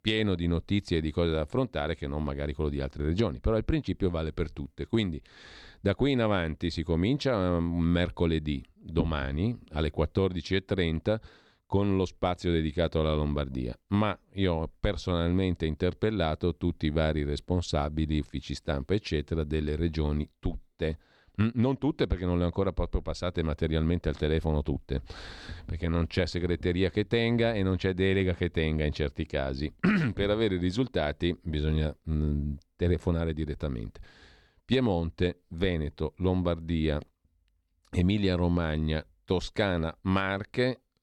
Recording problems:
none

